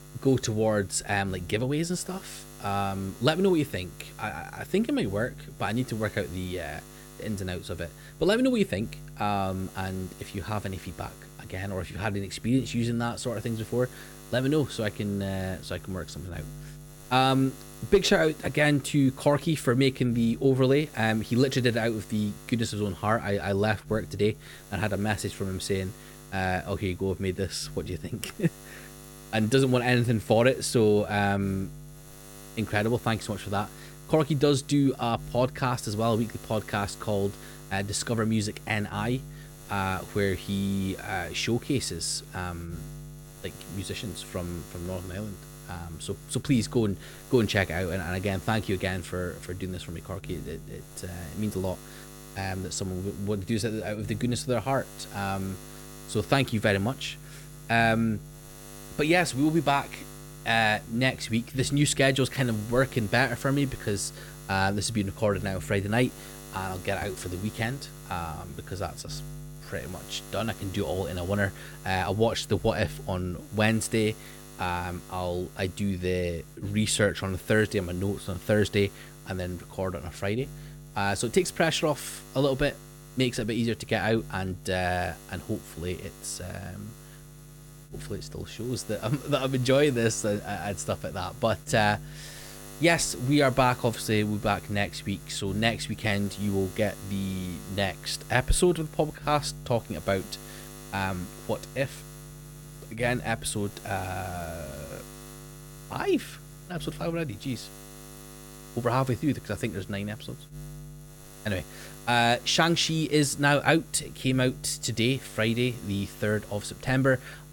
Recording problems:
electrical hum; noticeable; throughout; 60 Hz, 20 dB below the speech

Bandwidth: 17.5 kHz